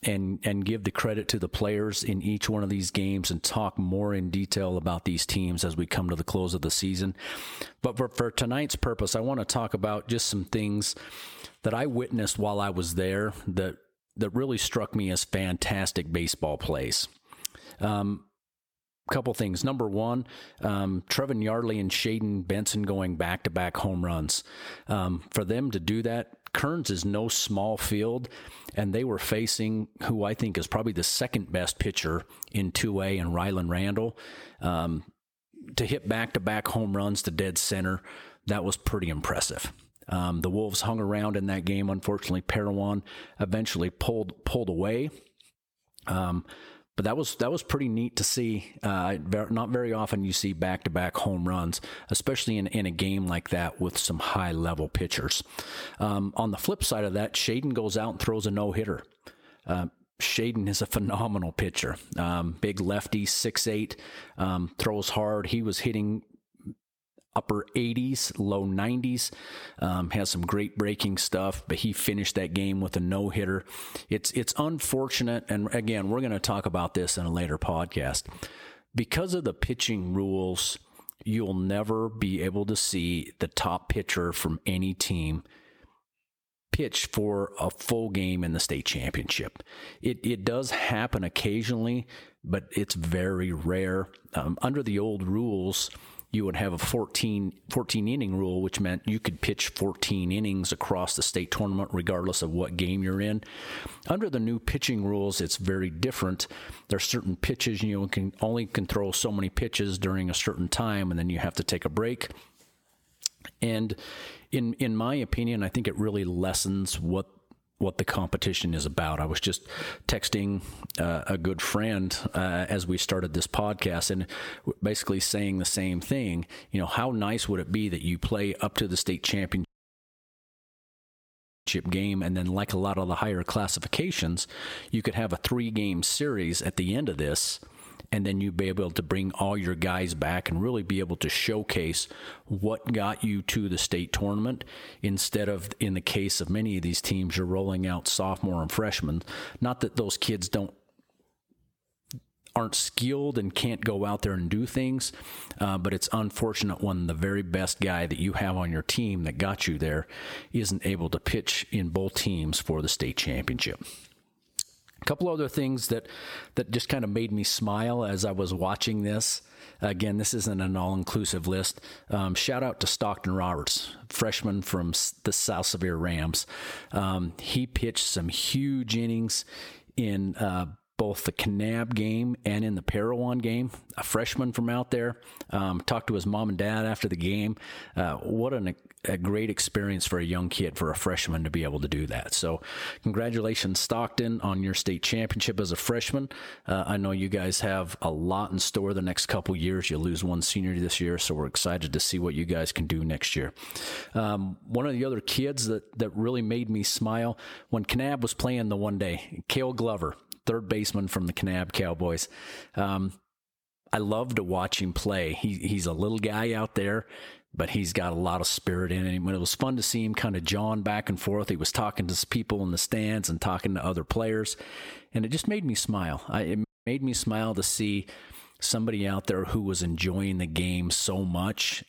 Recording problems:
squashed, flat; somewhat
audio cutting out; at 2:10 for 2 s and at 3:47

